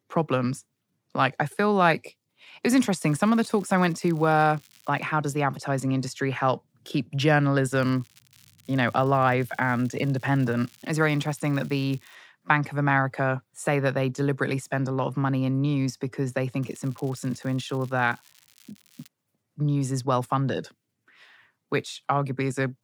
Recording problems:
crackling; faint; from 3 to 5 s, from 8 to 12 s and from 17 to 19 s; 30 dB below the speech

